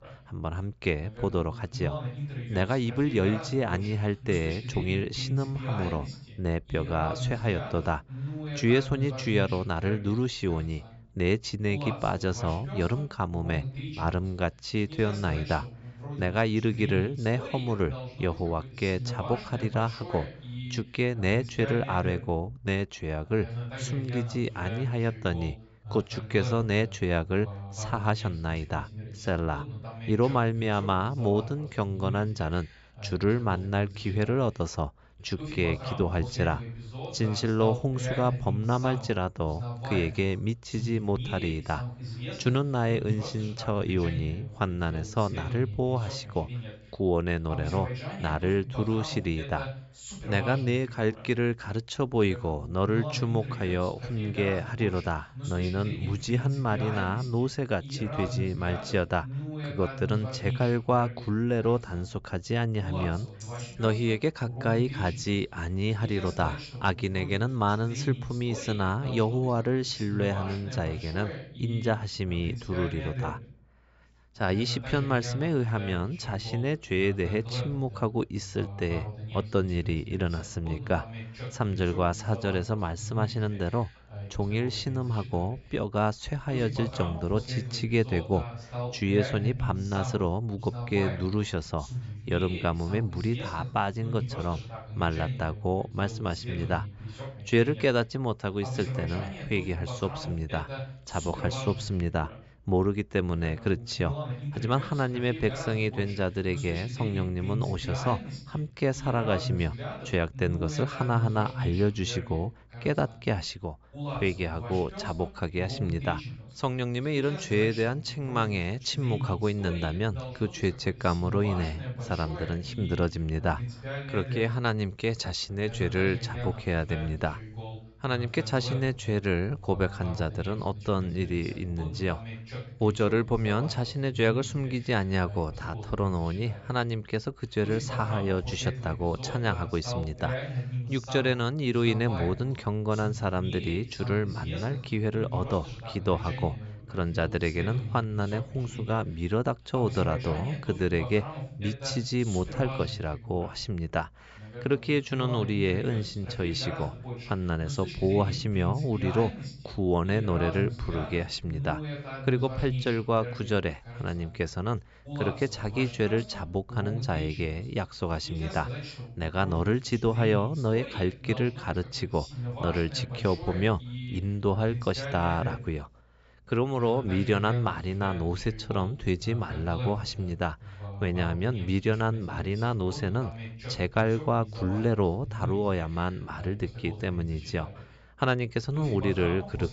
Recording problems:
high frequencies cut off; noticeable; nothing above 8 kHz
voice in the background; loud; throughout; 8 dB below the speech
jangling keys; faint; at 1:03; peak 15 dB below the speech

